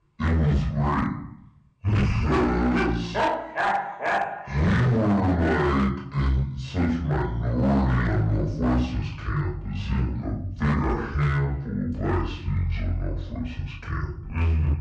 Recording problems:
off-mic speech; far
wrong speed and pitch; too slow and too low; 0.6 times normal speed
room echo; slight; dies away in 0.5 s
distortion; slight; 11% of the sound clipped

